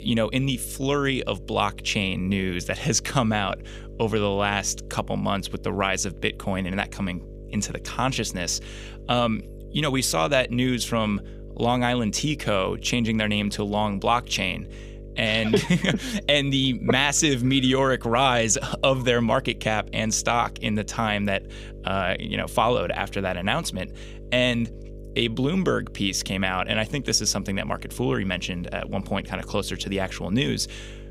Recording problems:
electrical hum; faint; throughout; 50 Hz, 25 dB below the speech

